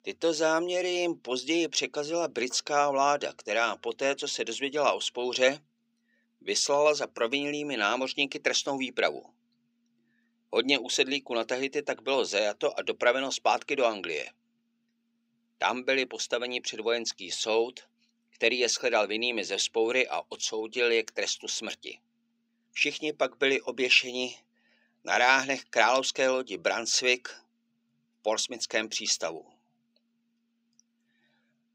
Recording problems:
thin; very slightly; fading below 350 Hz

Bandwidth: 15.5 kHz